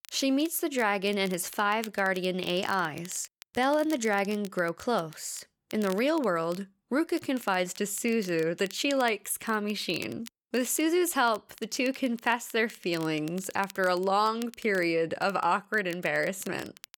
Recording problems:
crackle, like an old record; faint; 20 dB below the speech

